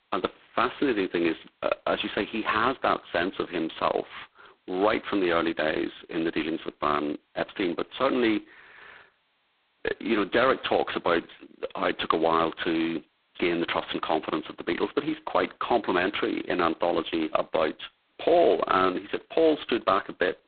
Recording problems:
phone-call audio; poor line; nothing above 4 kHz
garbled, watery; slightly

